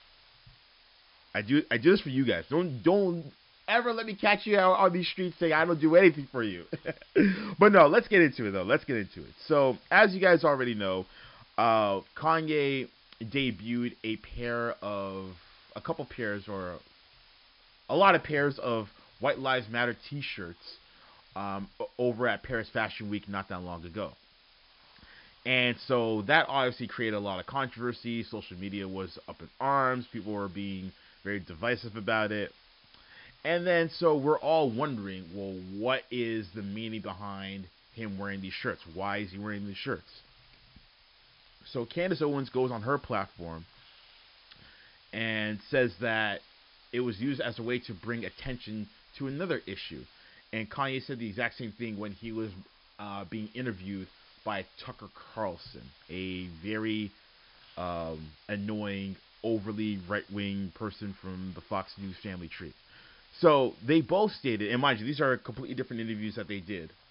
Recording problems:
high frequencies cut off; noticeable; nothing above 5.5 kHz
hiss; faint; throughout; 30 dB below the speech

